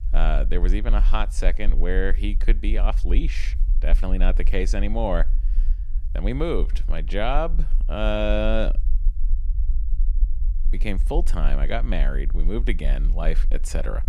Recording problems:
low rumble; faint; throughout; 20 dB below the speech

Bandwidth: 14.5 kHz